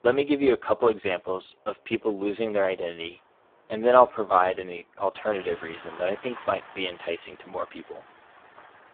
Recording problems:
phone-call audio; poor line
traffic noise; faint; throughout; 20 dB below the speech

